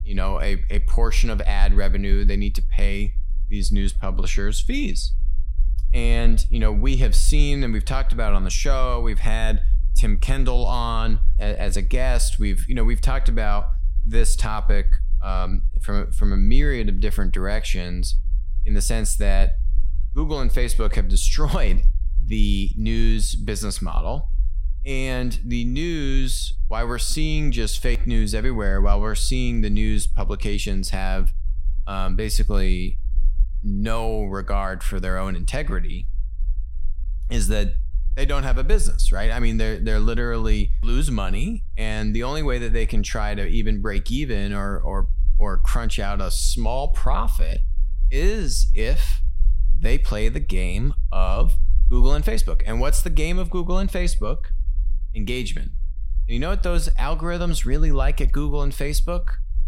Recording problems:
low rumble; faint; throughout; 25 dB below the speech

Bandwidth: 16 kHz